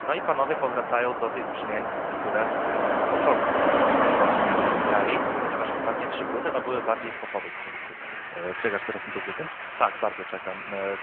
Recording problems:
phone-call audio
traffic noise; very loud; throughout; 2 dB above the speech

